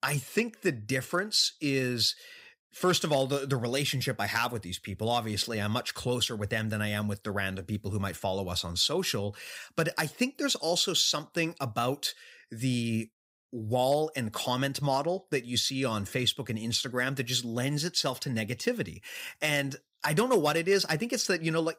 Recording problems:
none

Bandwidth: 15.5 kHz